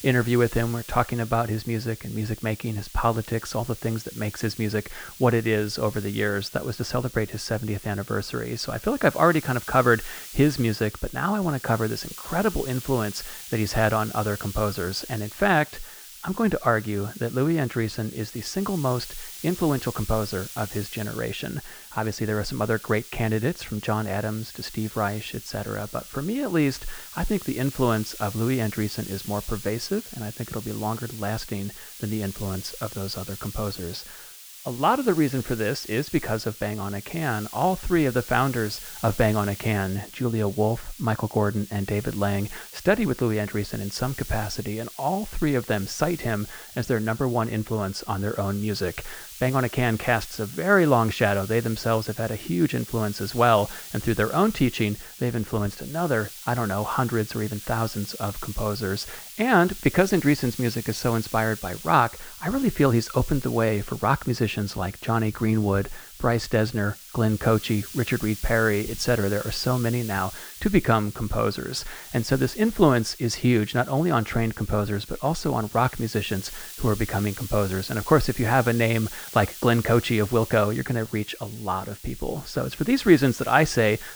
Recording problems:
muffled; slightly; fading above 3.5 kHz
hiss; noticeable; throughout; 15 dB below the speech

